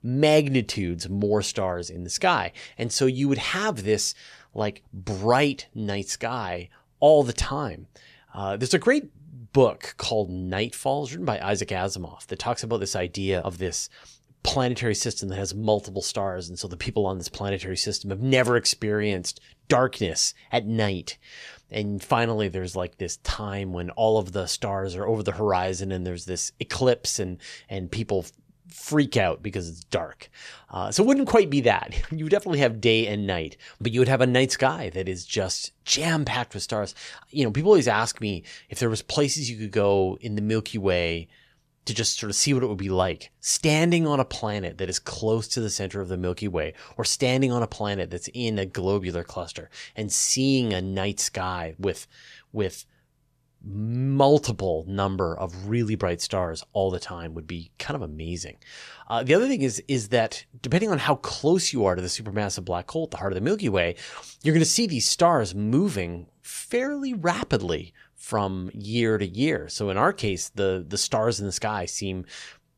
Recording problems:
none

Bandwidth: 14 kHz